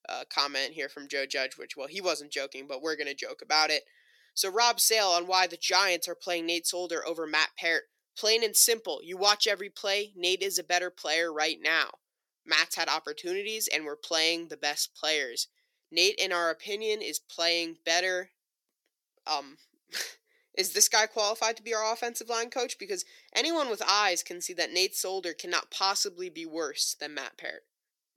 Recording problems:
thin; very; fading below 350 Hz

